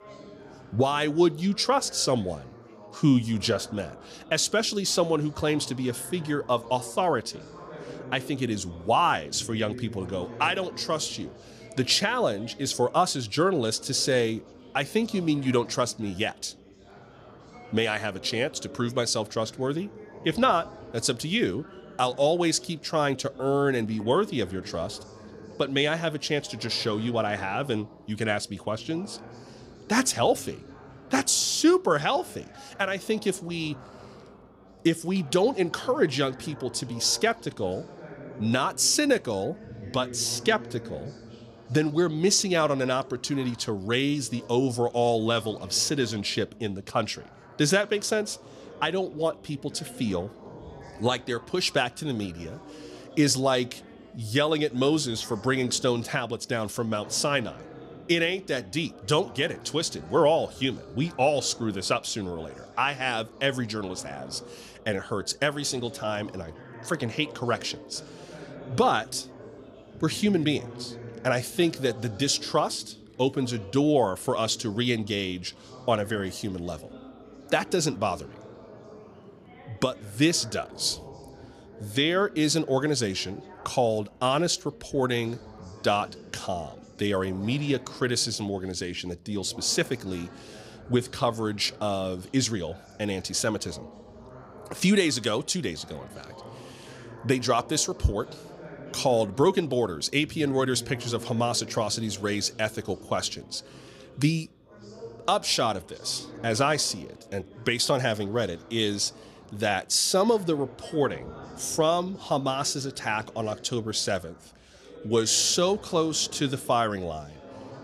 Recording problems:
background chatter; noticeable; throughout; 4 voices, 20 dB below the speech

